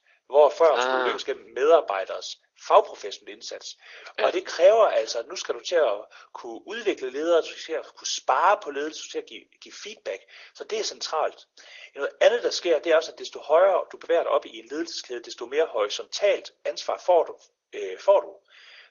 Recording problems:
thin; very; fading below 400 Hz
garbled, watery; slightly; nothing above 6.5 kHz

